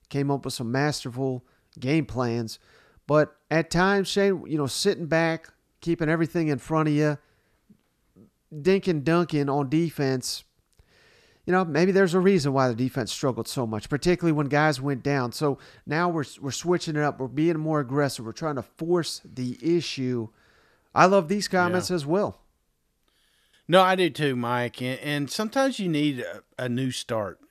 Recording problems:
none

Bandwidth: 14 kHz